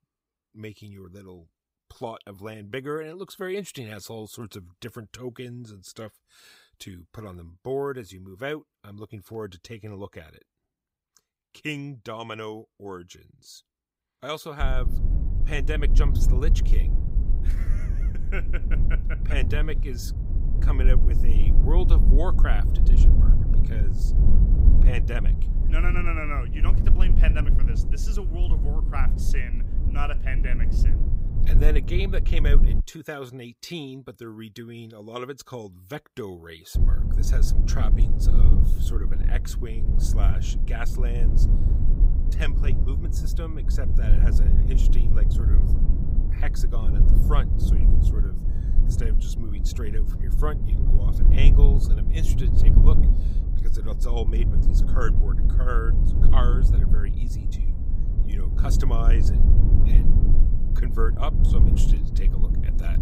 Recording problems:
low rumble; loud; from 15 to 33 s and from 37 s on; 5 dB below the speech

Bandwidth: 15.5 kHz